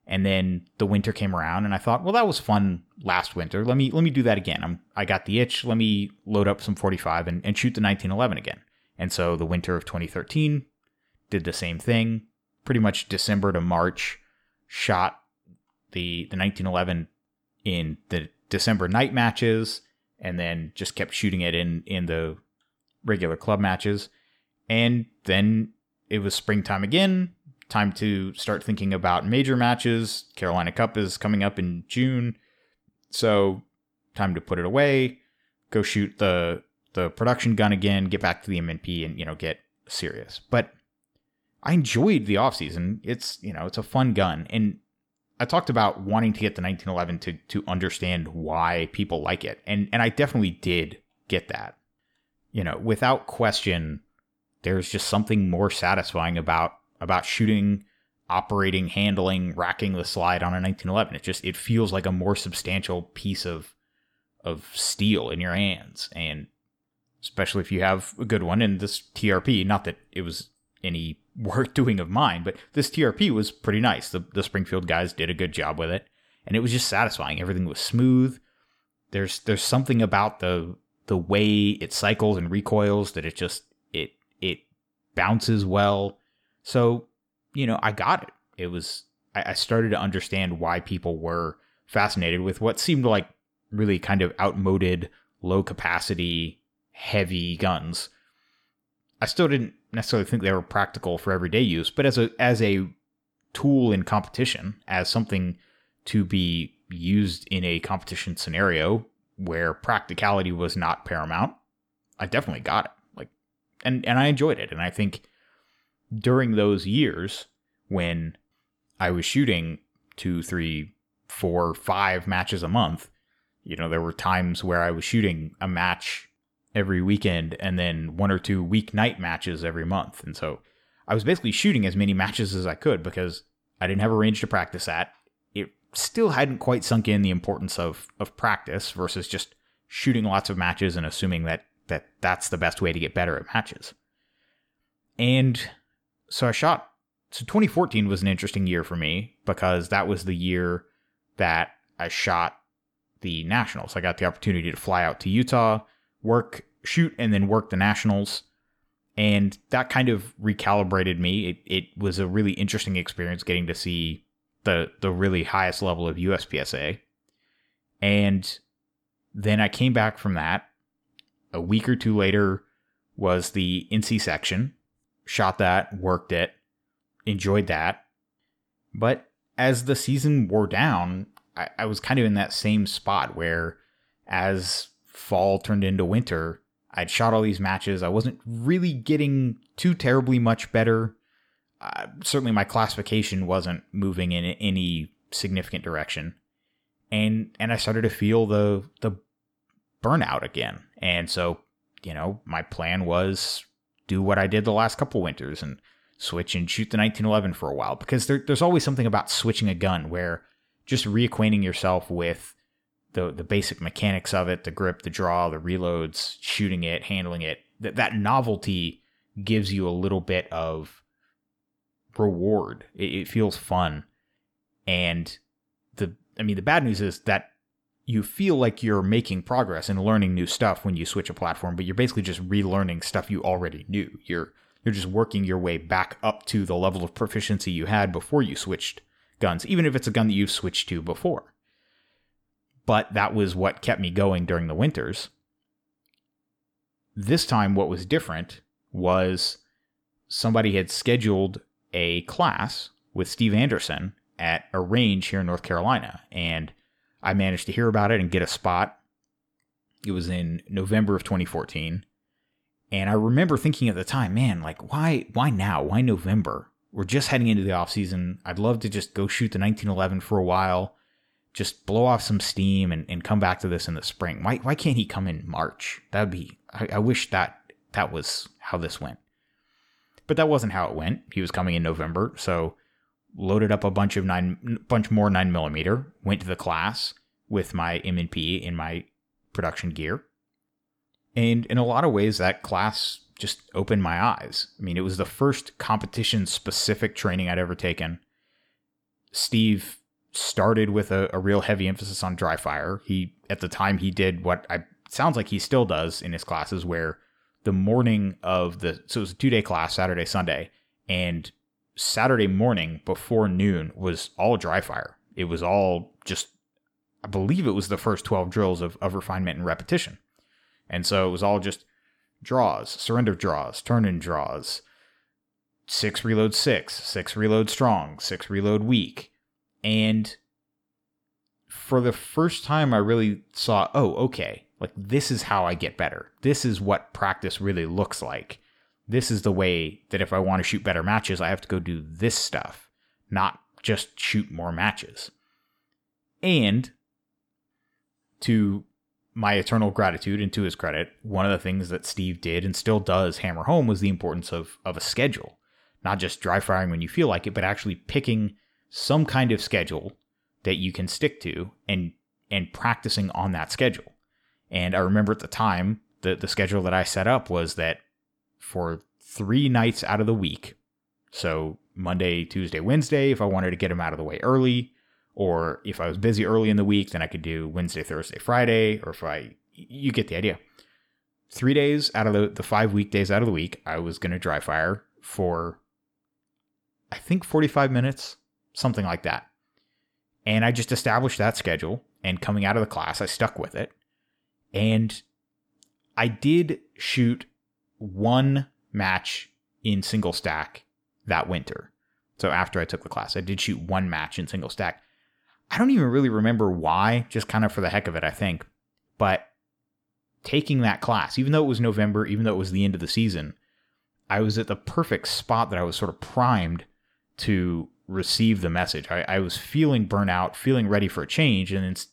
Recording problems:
none

